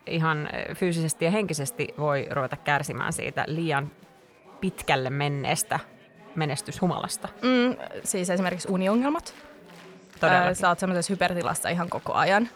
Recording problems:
chatter from many people; faint; throughout; 20 dB below the speech

